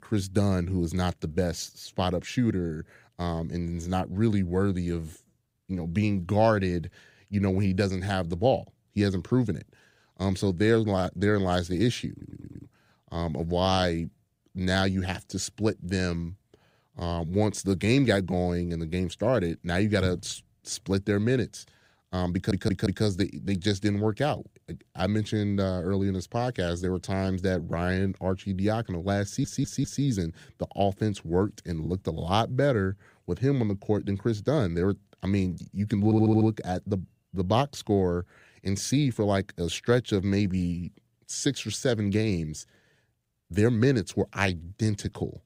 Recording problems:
audio stuttering; 4 times, first at 12 s

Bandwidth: 15.5 kHz